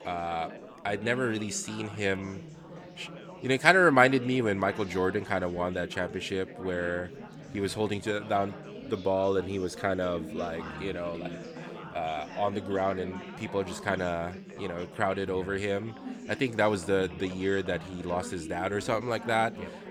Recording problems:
chatter from many people; noticeable; throughout; 15 dB below the speech

